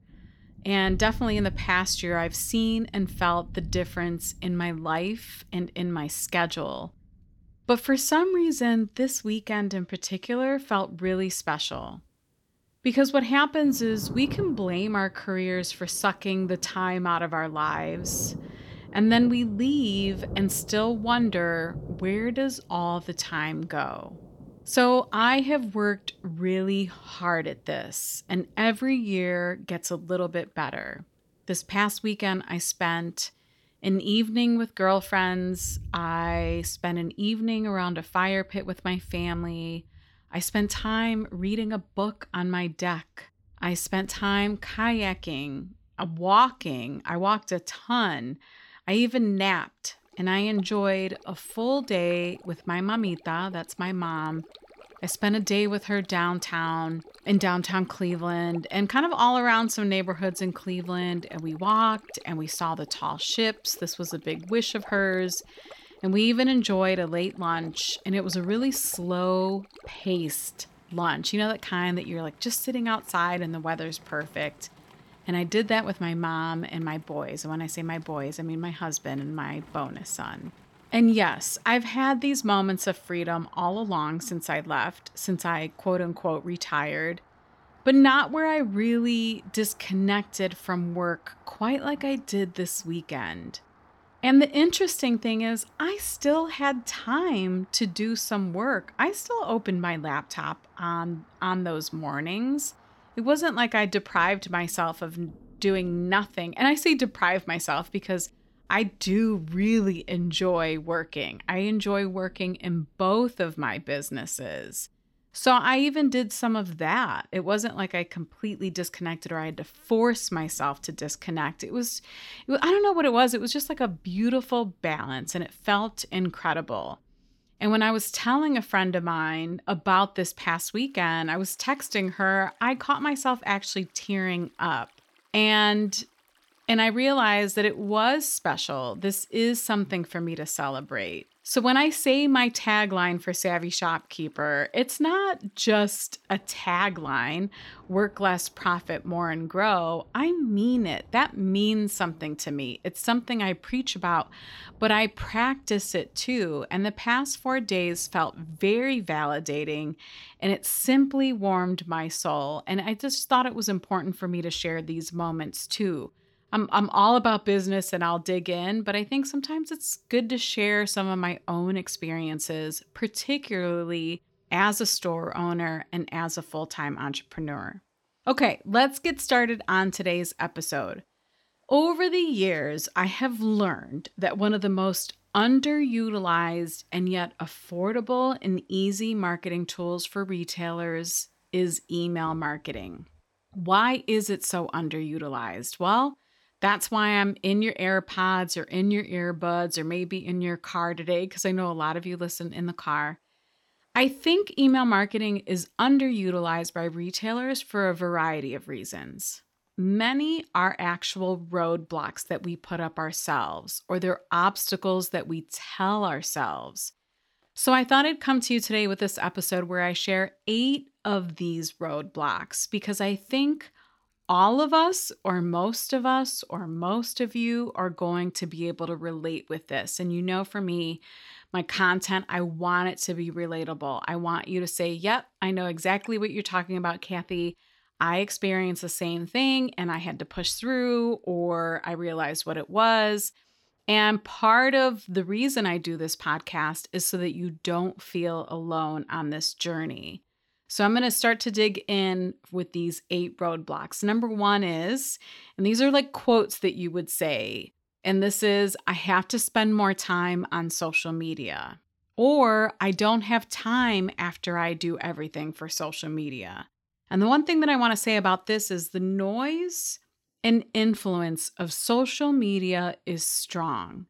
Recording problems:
rain or running water; faint; throughout; 20 dB below the speech

